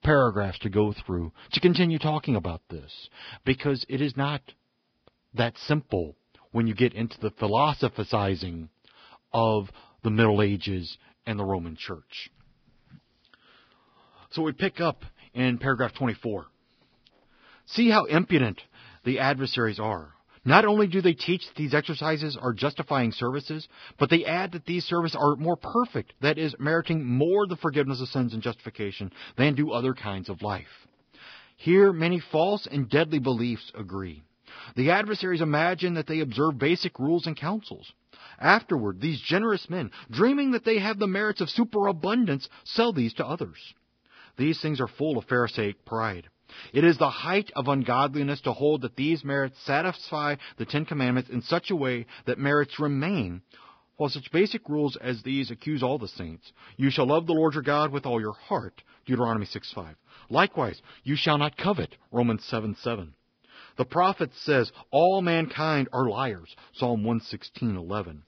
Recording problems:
garbled, watery; badly; nothing above 5 kHz

